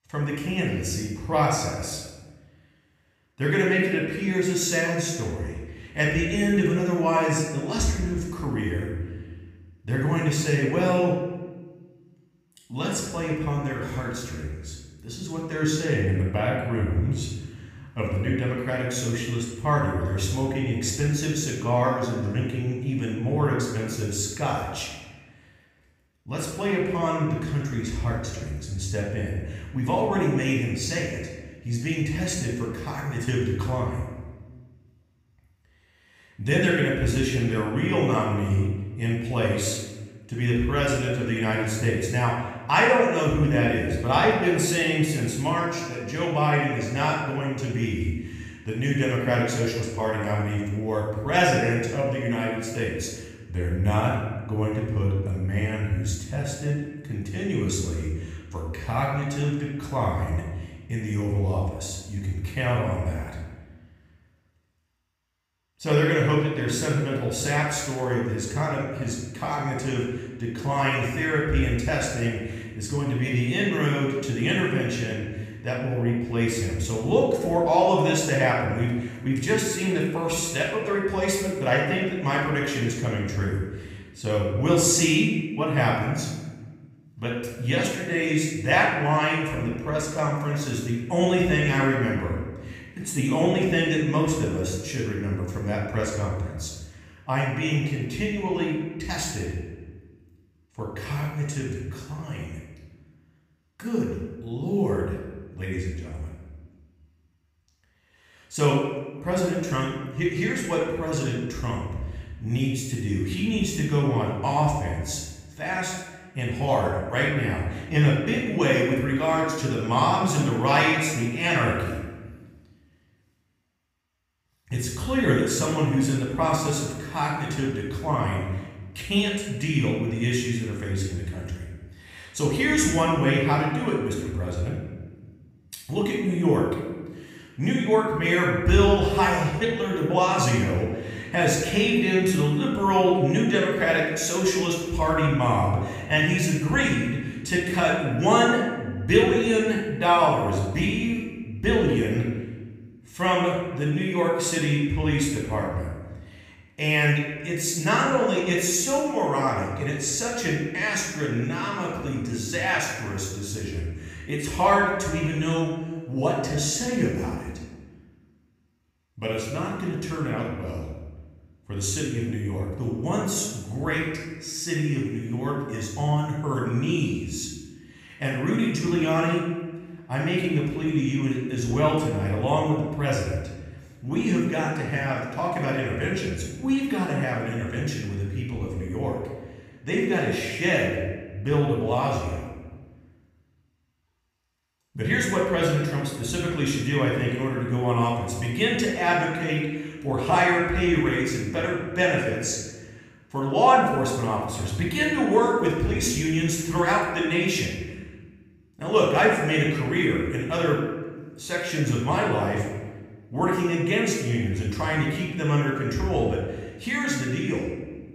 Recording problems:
off-mic speech; far
room echo; noticeable; dies away in 1.1 s

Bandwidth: 15 kHz